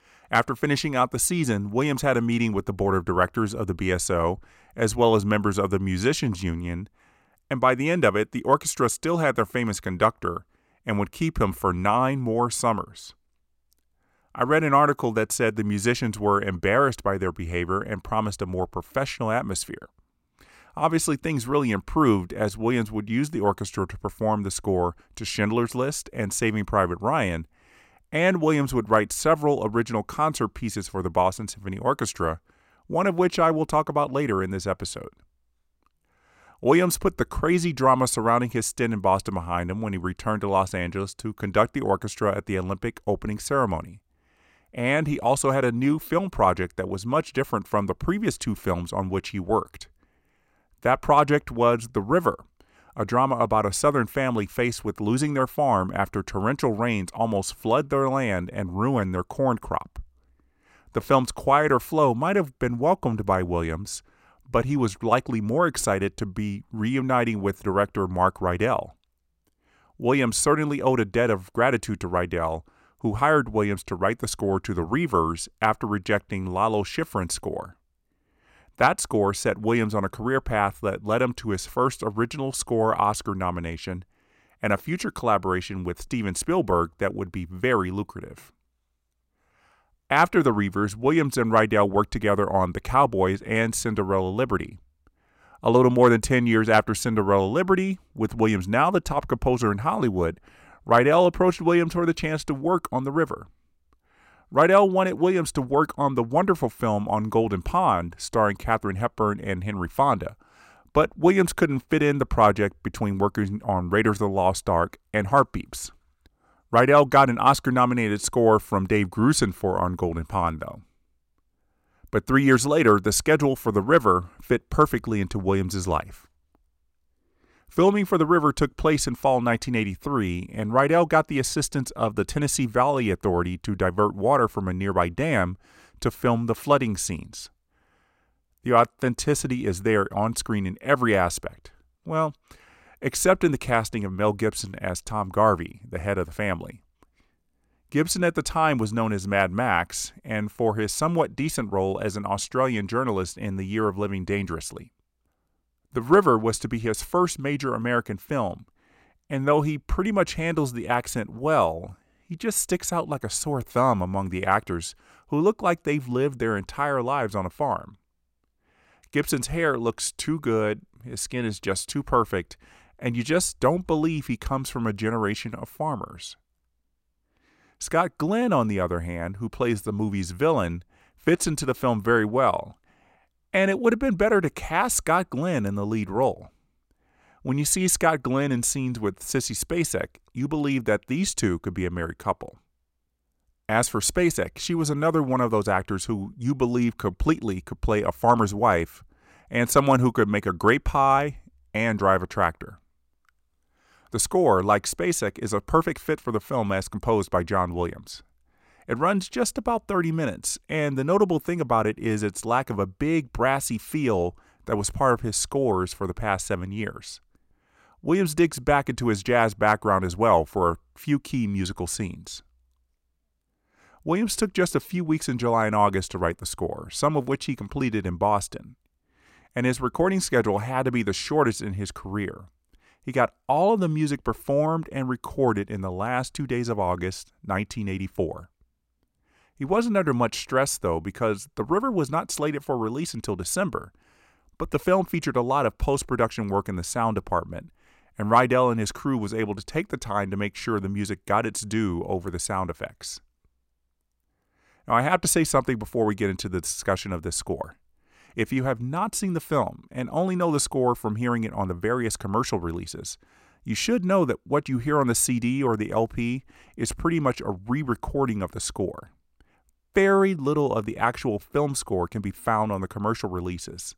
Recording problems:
none

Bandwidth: 16 kHz